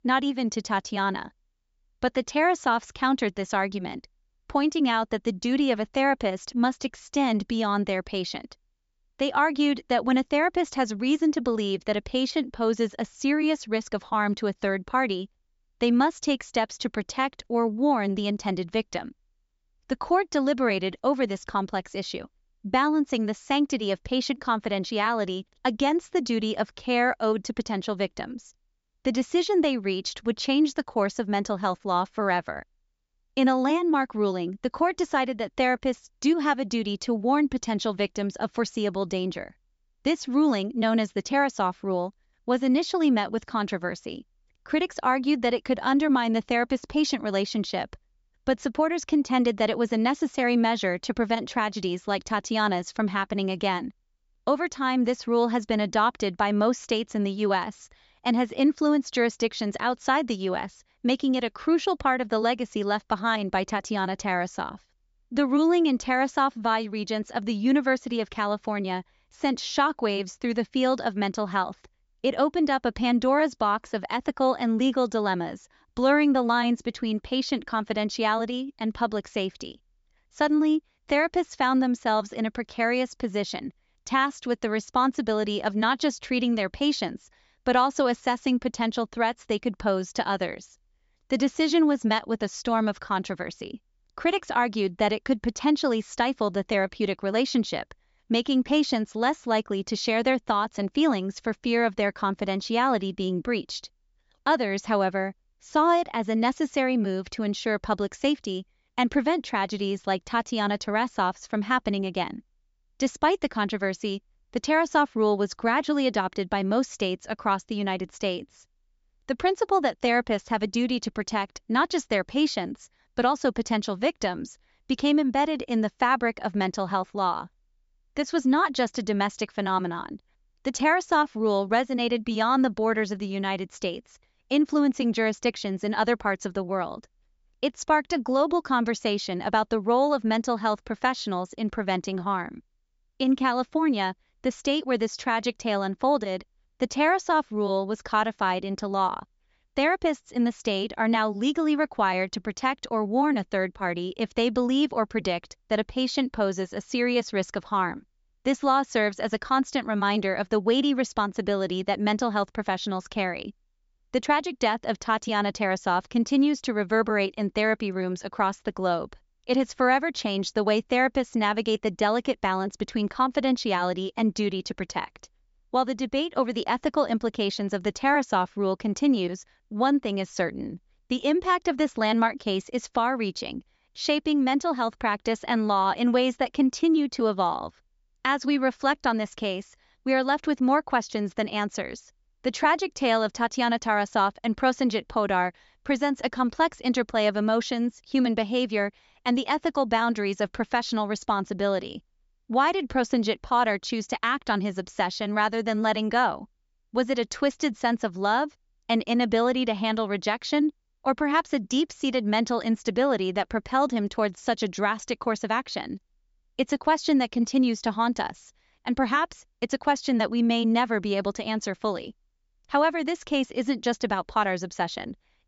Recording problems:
high frequencies cut off; noticeable; nothing above 8 kHz

